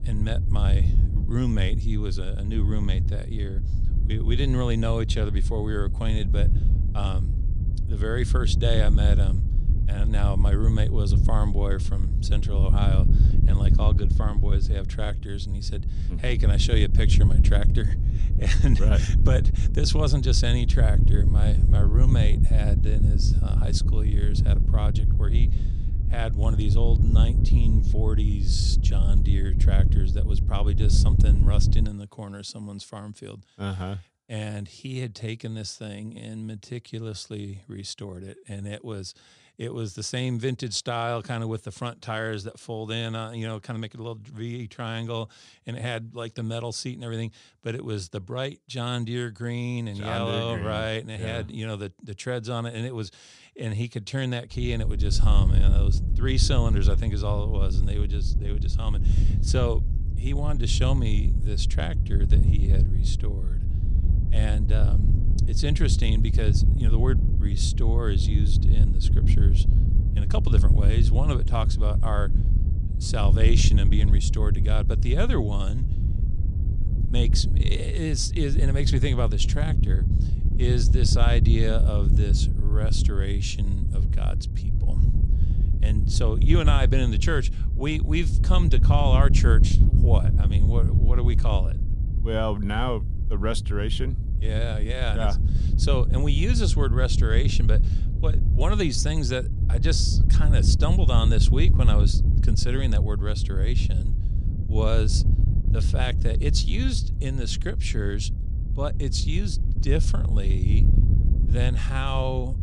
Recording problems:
wind noise on the microphone; heavy; until 32 s and from 55 s on; 7 dB below the speech

